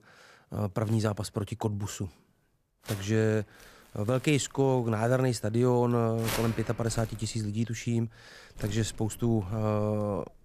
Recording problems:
household noises; noticeable; throughout; 15 dB below the speech

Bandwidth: 14.5 kHz